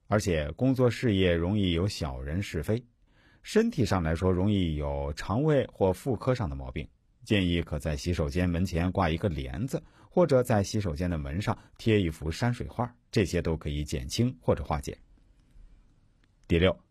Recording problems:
none

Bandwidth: 14.5 kHz